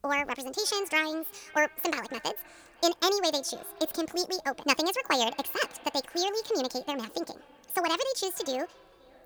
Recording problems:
wrong speed and pitch; too fast and too high; 1.7 times normal speed
echo of what is said; faint; throughout; 520 ms later, 25 dB below the speech

